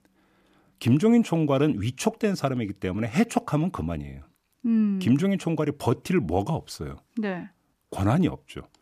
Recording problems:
none

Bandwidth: 14.5 kHz